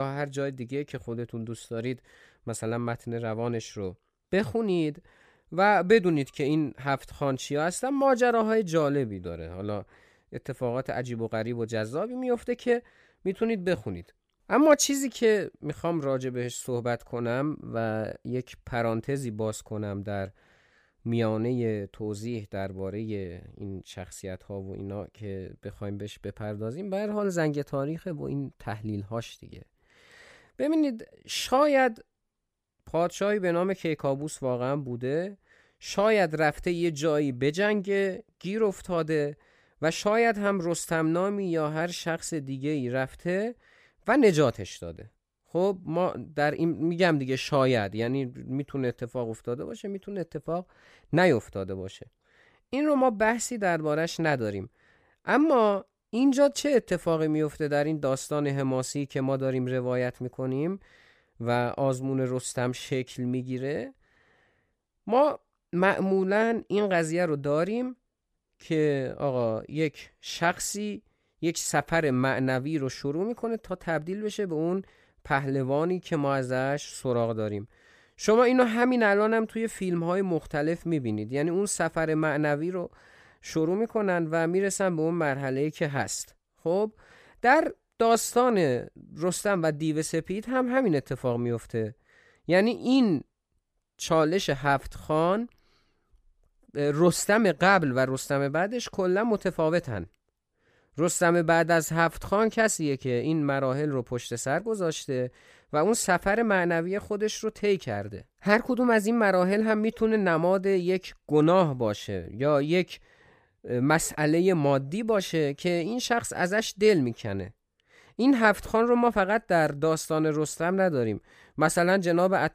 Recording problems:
abrupt cut into speech; at the start

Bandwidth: 15 kHz